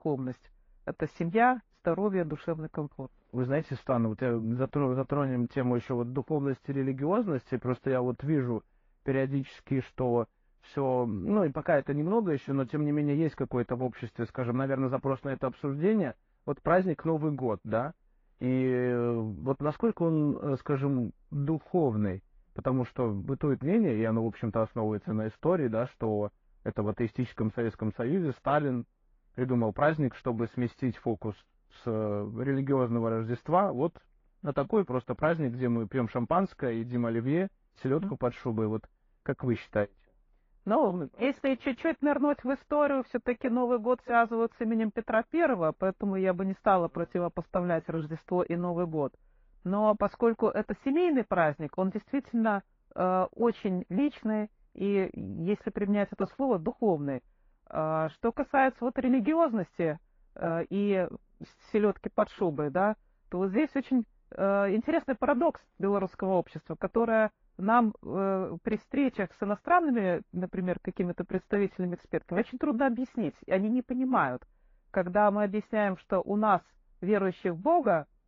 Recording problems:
muffled; very; fading above 1.5 kHz
garbled, watery; slightly

